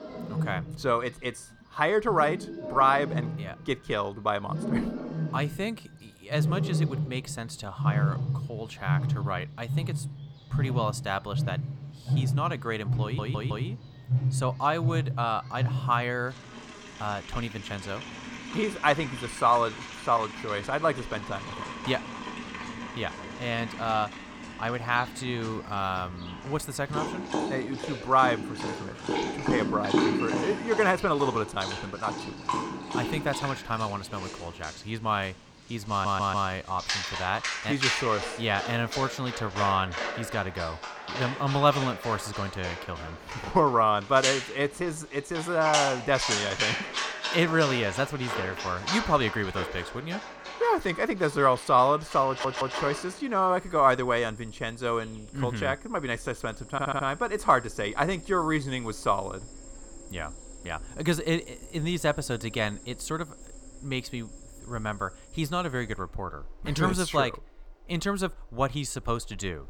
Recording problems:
animal sounds; loud; throughout; 4 dB below the speech
audio stuttering; 4 times, first at 13 s

